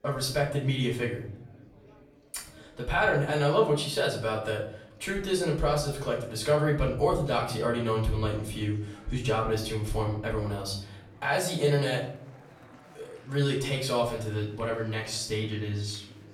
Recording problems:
off-mic speech; far
room echo; slight; dies away in 0.5 s
chatter from many people; faint; throughout; 25 dB below the speech

